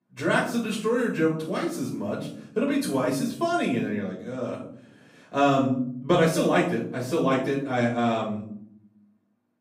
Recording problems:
off-mic speech; far
room echo; noticeable; dies away in 0.6 s

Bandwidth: 15.5 kHz